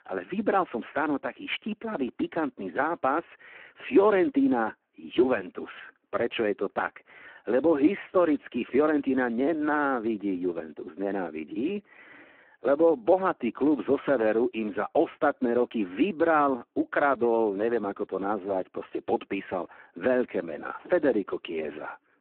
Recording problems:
phone-call audio; poor line

